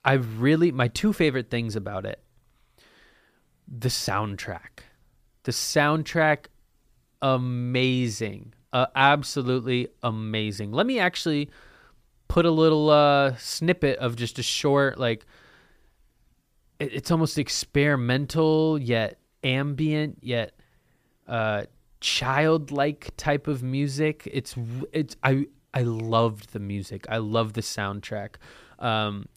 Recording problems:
none

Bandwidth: 15 kHz